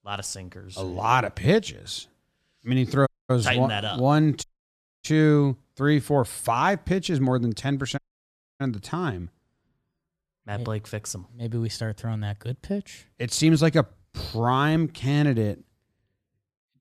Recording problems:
audio cutting out; at 3 s, at 4.5 s for 0.5 s and at 8 s for 0.5 s

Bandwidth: 14 kHz